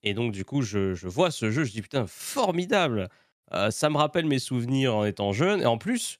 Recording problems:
none

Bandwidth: 14.5 kHz